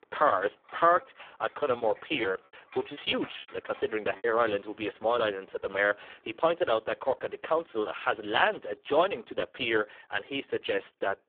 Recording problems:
phone-call audio; poor line
household noises; faint; throughout; 25 dB below the speech
choppy; very; from 1.5 to 4 s; 14% of the speech affected

